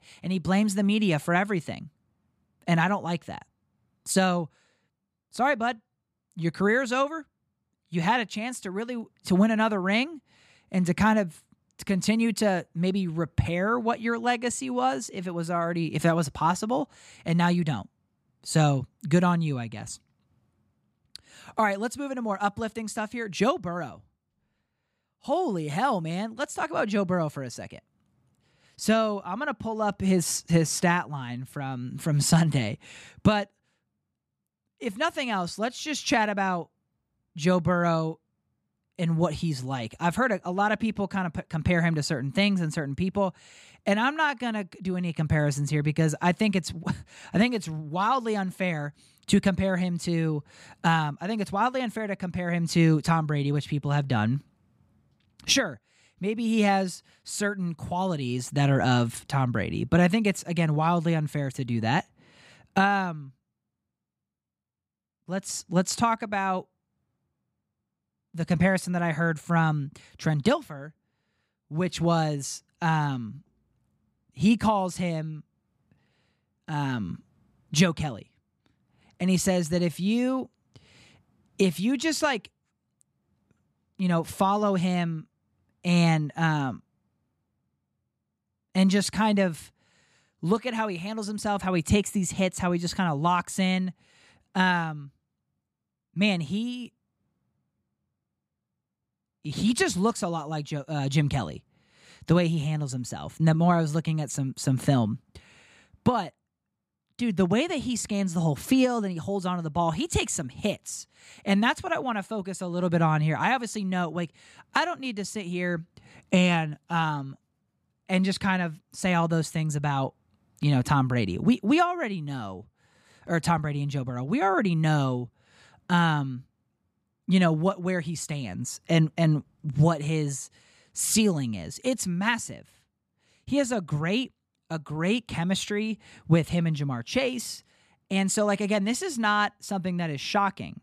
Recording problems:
none

